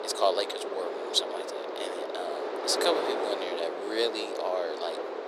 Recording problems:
thin; very; fading below 400 Hz
wind noise on the microphone; heavy; 3 dB below the speech
background chatter; faint; throughout; 3 voices, 25 dB below the speech

